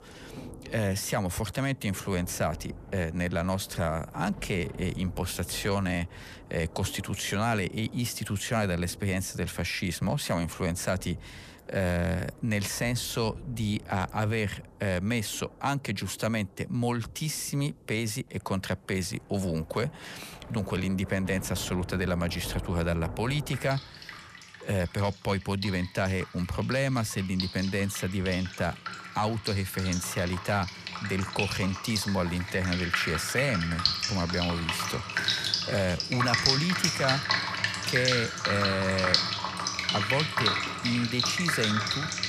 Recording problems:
rain or running water; very loud; throughout; as loud as the speech

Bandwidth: 14.5 kHz